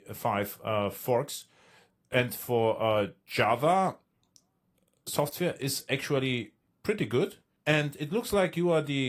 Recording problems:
garbled, watery; slightly
abrupt cut into speech; at the end

